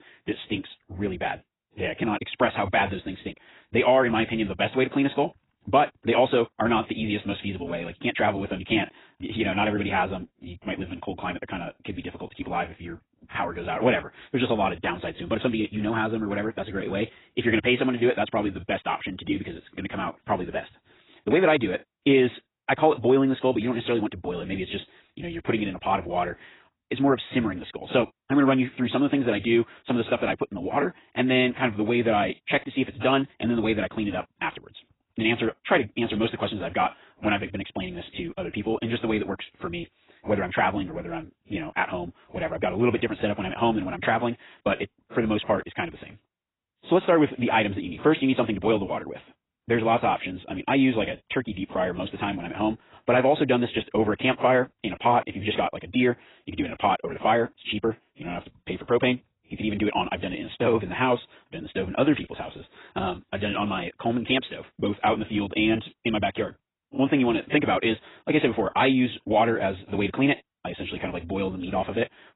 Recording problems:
garbled, watery; badly; nothing above 4 kHz
wrong speed, natural pitch; too fast; 1.5 times normal speed

